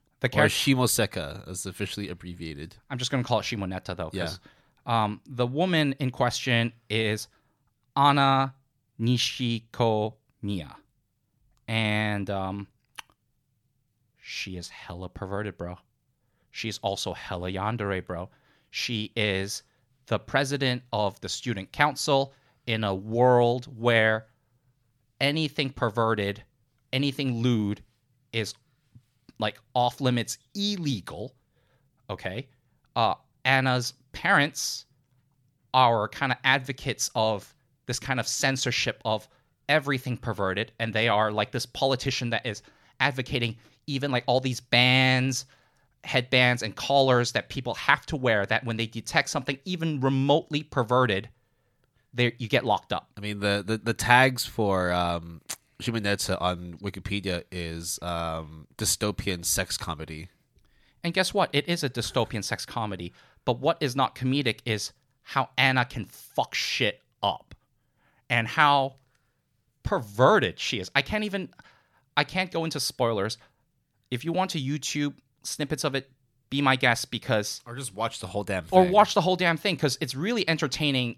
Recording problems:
none

